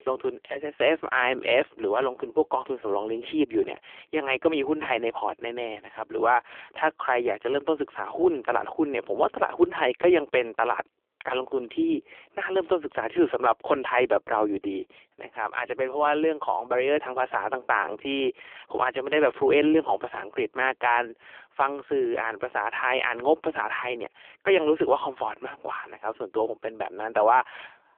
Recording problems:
phone-call audio; poor line; nothing above 3 kHz

